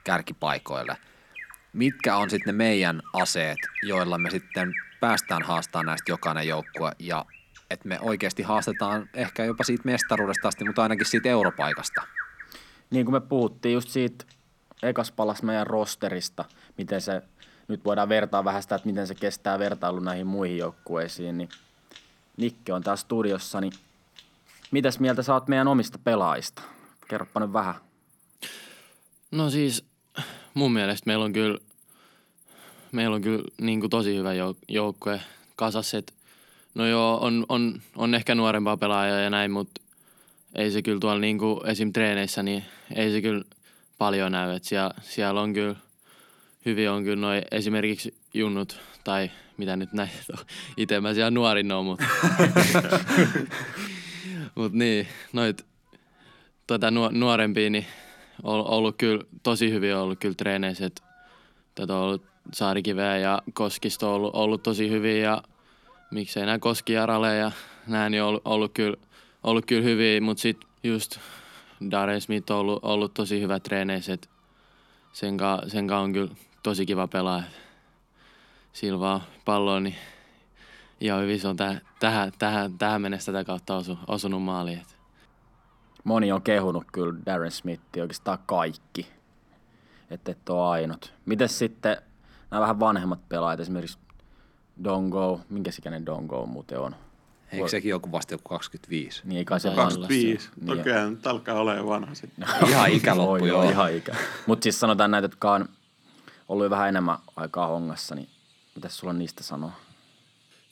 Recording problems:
animal sounds; loud; throughout; 9 dB below the speech

